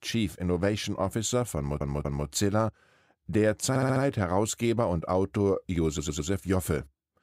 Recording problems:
audio stuttering; at 1.5 s, at 3.5 s and at 6 s

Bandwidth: 15.5 kHz